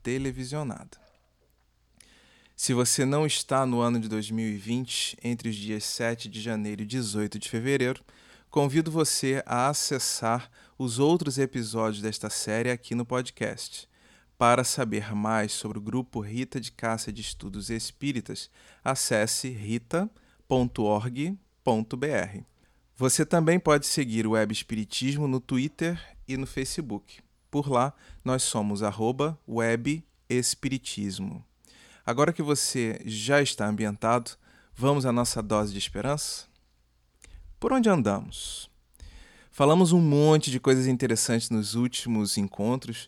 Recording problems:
none

